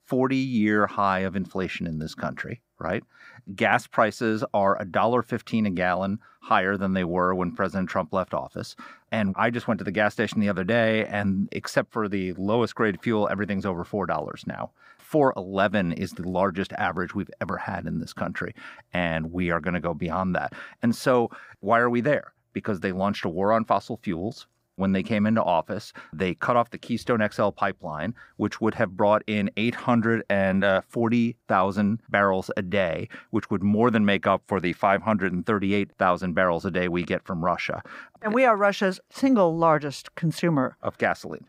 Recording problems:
muffled; slightly; fading above 3.5 kHz

